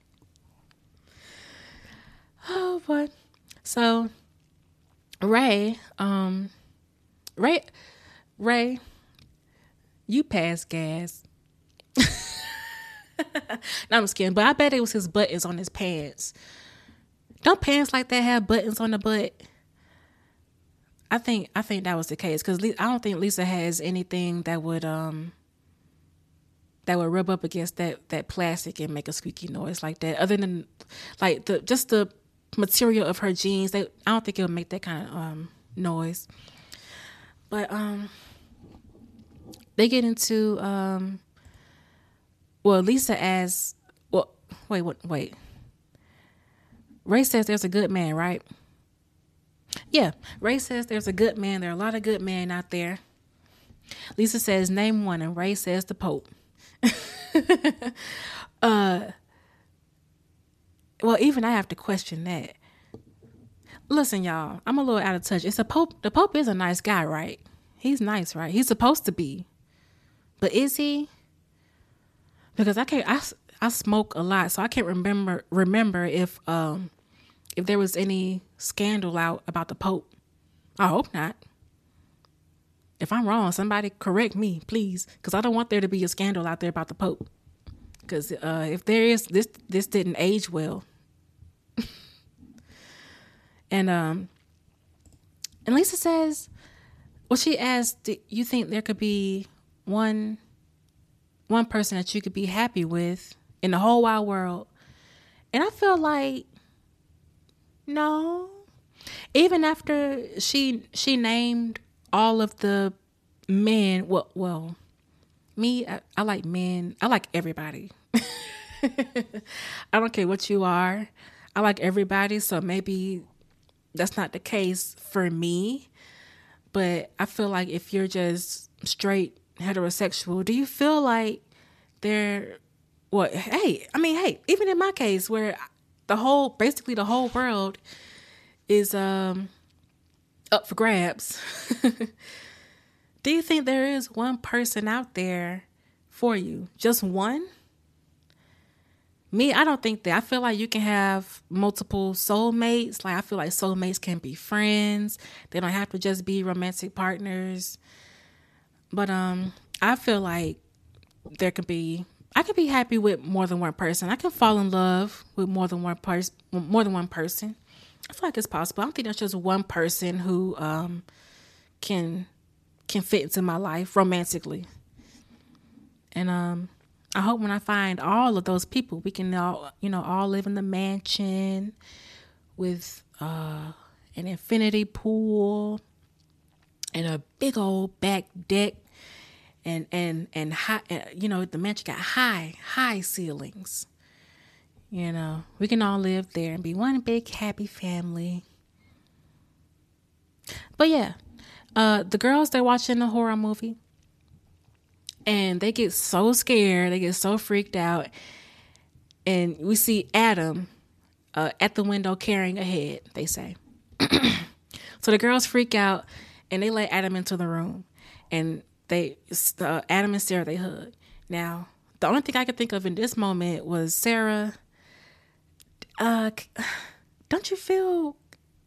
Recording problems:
none

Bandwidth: 14 kHz